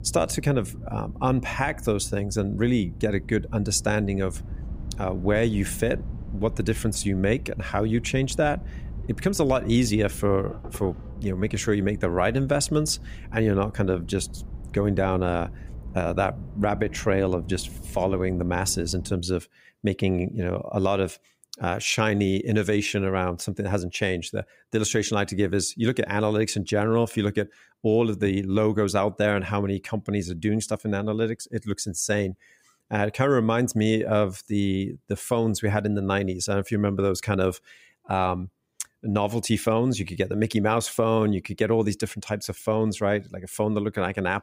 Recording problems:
low rumble; faint; until 19 s; 25 dB below the speech

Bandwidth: 15.5 kHz